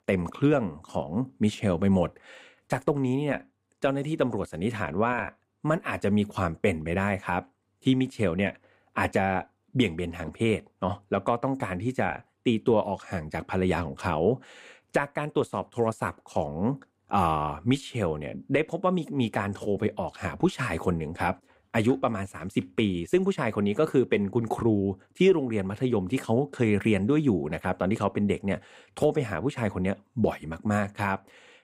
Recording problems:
none

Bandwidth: 15.5 kHz